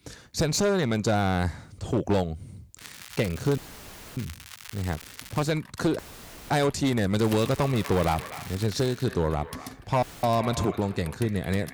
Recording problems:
echo of what is said; noticeable; from 7.5 s on; 240 ms later, 15 dB below the speech
distortion; slight; 7% of the sound clipped
household noises; noticeable; from 5 s on; 20 dB below the speech
crackling; noticeable; from 3 to 5.5 s and from 7 to 9 s; 15 dB below the speech
audio cutting out; filled with static; at 3.5 s for 0.5 s, at 6 s for 0.5 s and at 10 s

